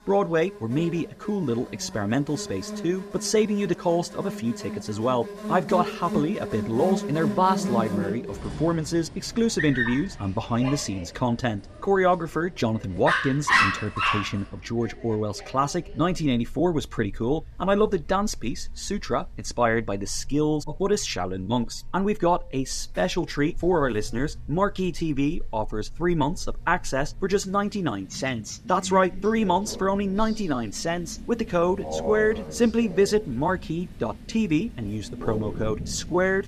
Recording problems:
animal sounds; loud; throughout; 6 dB below the speech

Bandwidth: 14.5 kHz